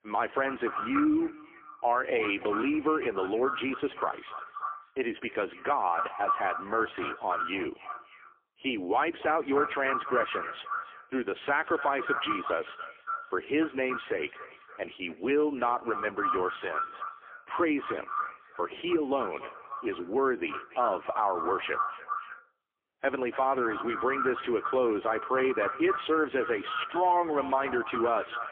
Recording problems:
phone-call audio; poor line; nothing above 3.5 kHz
echo of what is said; strong; throughout; 290 ms later, 6 dB below the speech

